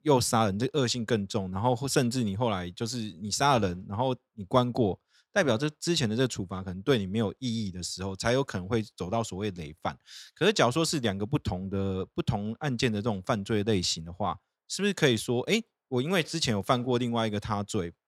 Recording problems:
none

